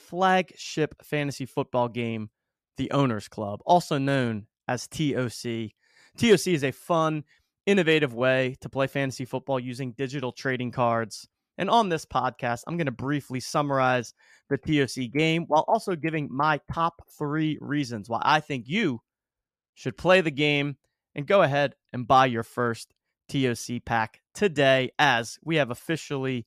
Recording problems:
none

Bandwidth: 14.5 kHz